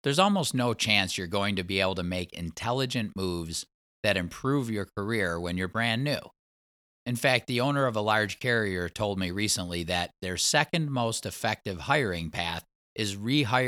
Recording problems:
abrupt cut into speech; at the end

